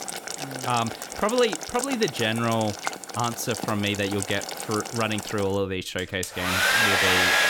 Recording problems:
household noises; very loud; throughout; as loud as the speech

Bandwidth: 17 kHz